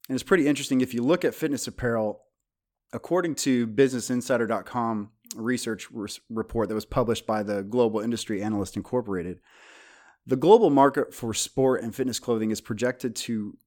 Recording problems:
none

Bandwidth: 17.5 kHz